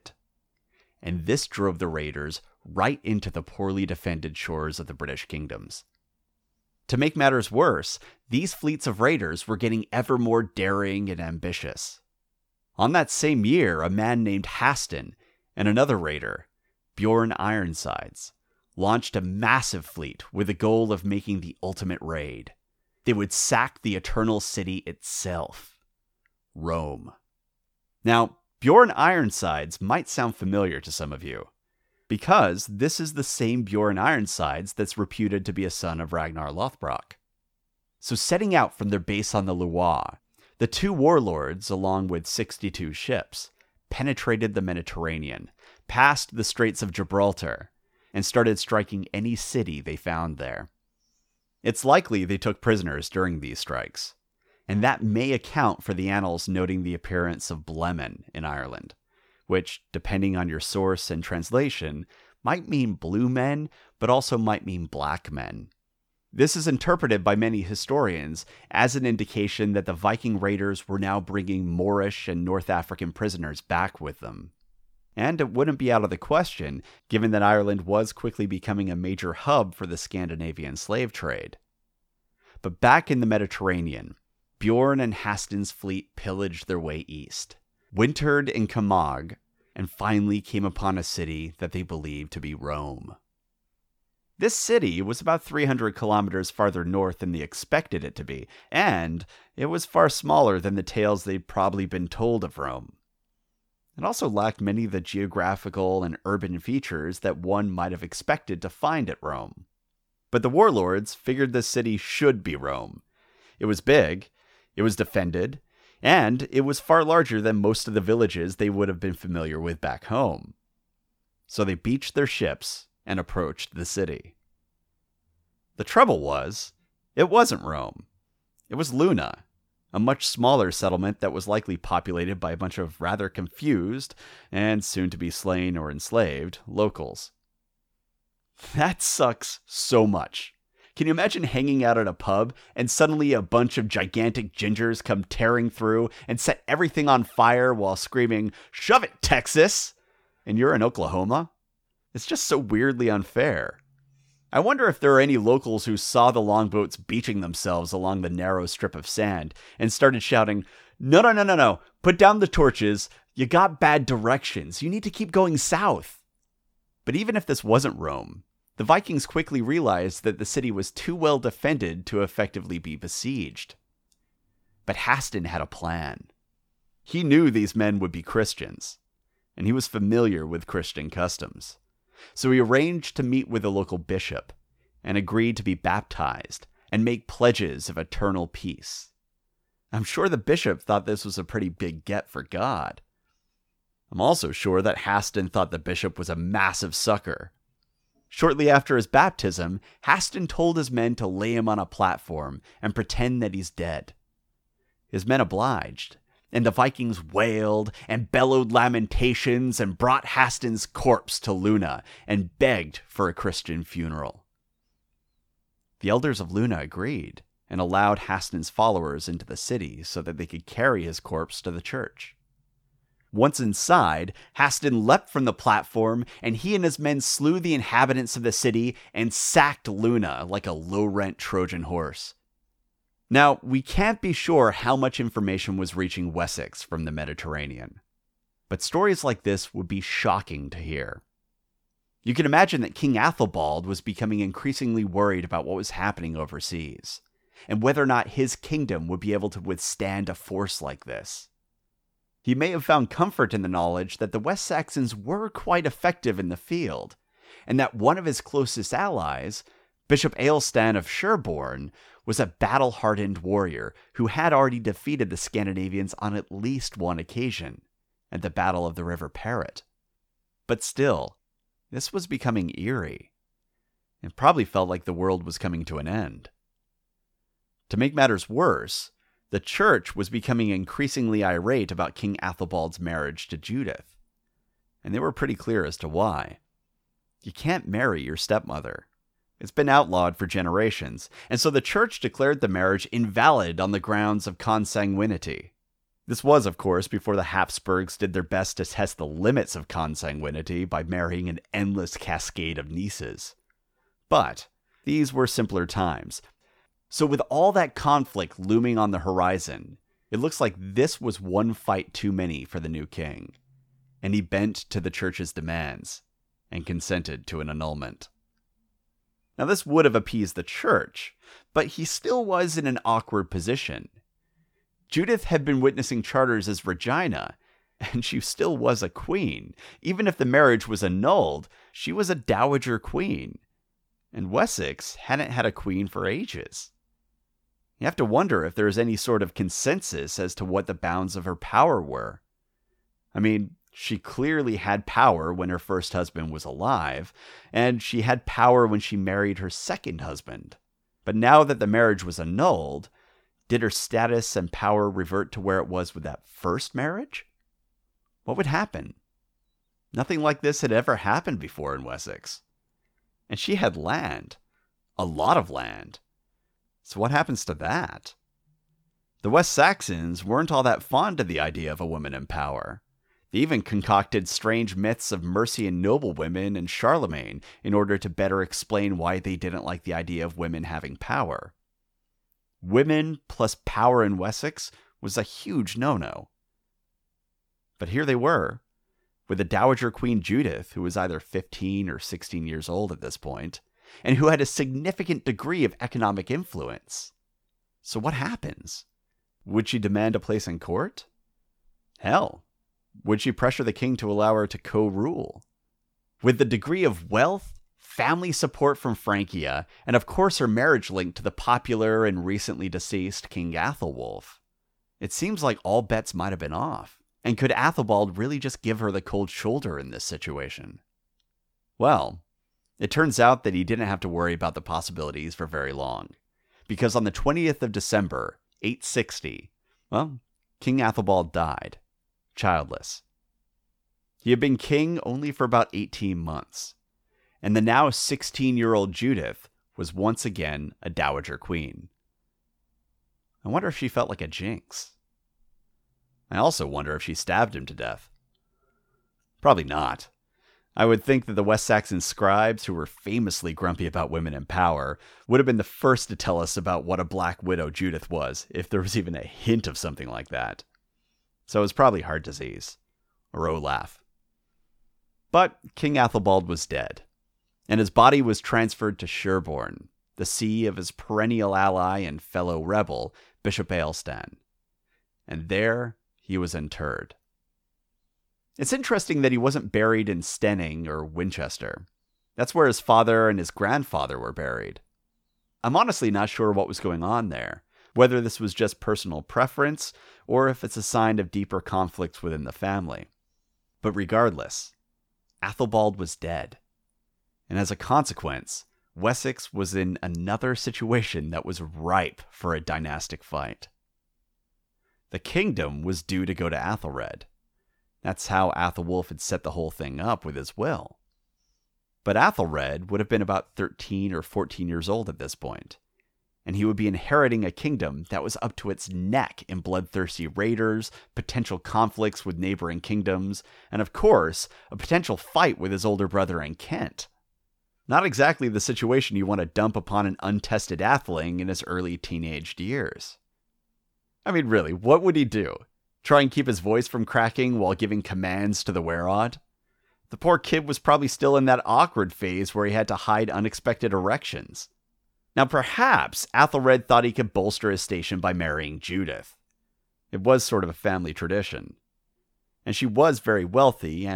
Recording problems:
abrupt cut into speech; at the end

